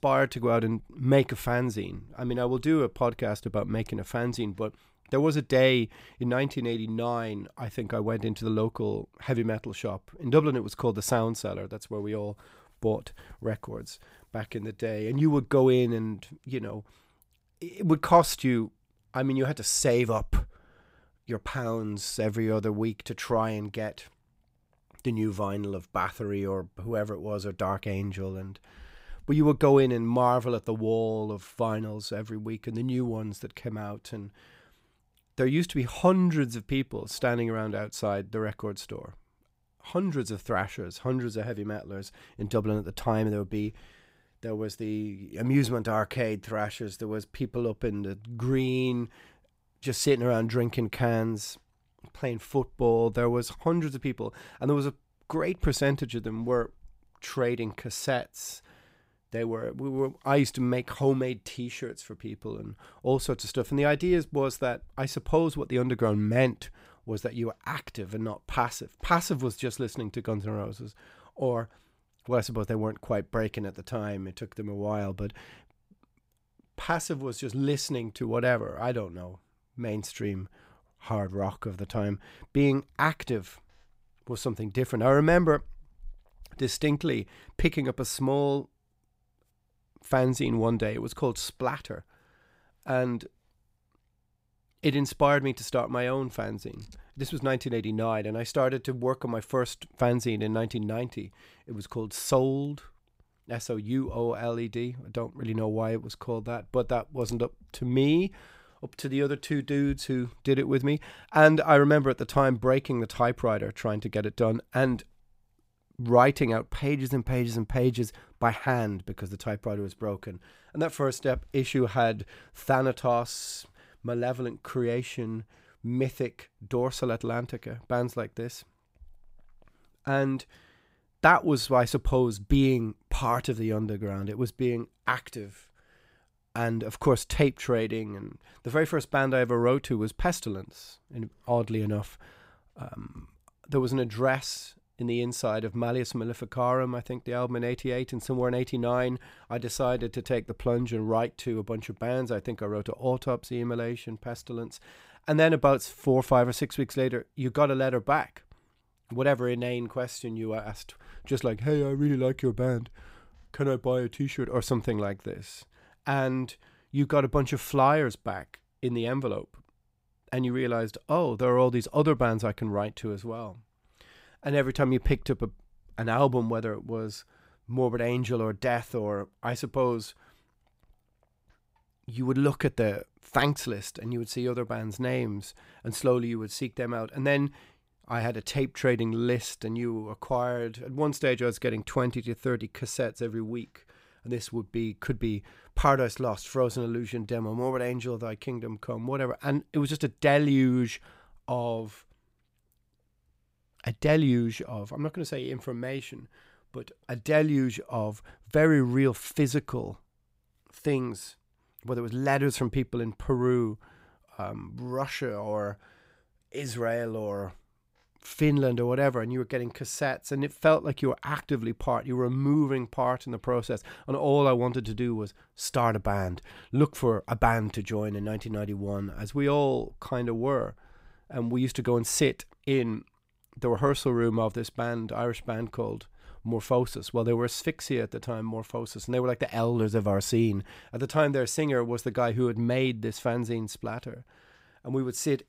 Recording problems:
none

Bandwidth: 15.5 kHz